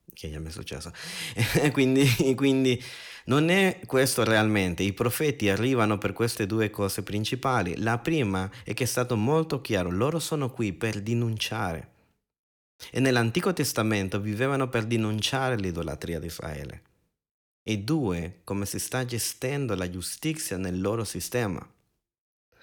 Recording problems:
none

